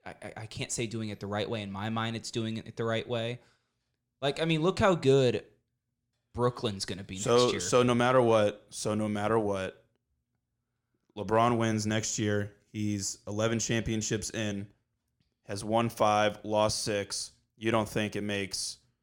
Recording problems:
none

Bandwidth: 17 kHz